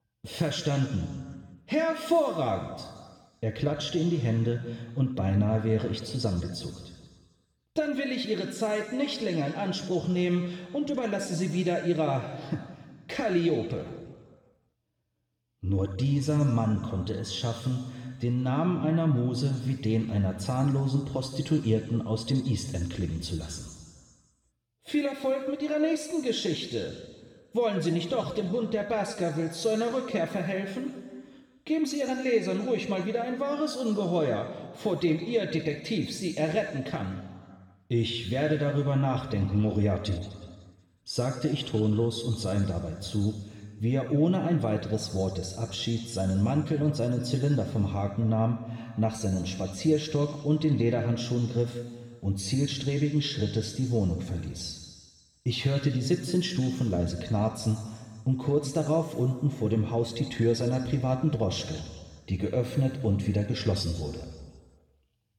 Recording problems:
room echo; noticeable; dies away in 1.5 s
off-mic speech; somewhat distant

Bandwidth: 18.5 kHz